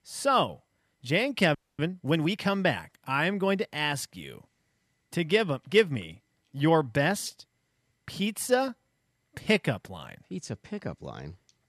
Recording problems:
audio freezing; at 1.5 s

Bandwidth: 13.5 kHz